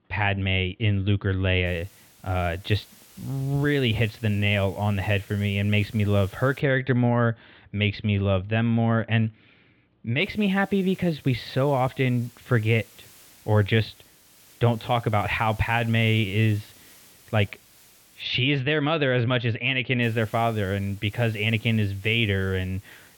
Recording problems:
muffled; very; fading above 3.5 kHz
hiss; faint; from 1.5 to 6.5 s, from 10 to 18 s and from 20 s on; 25 dB below the speech

